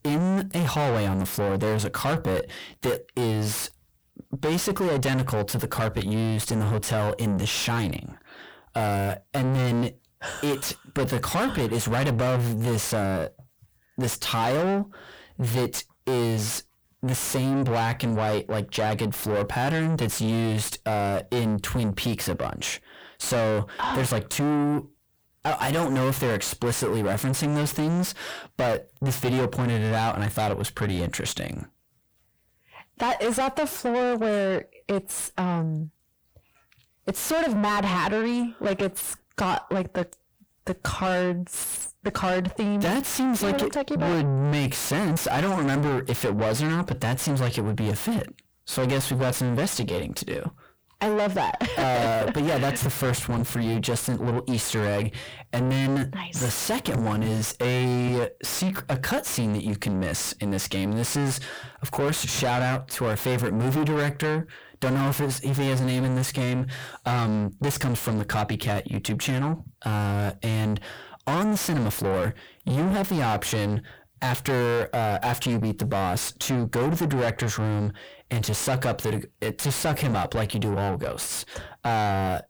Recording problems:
distortion; heavy; 5 dB below the speech

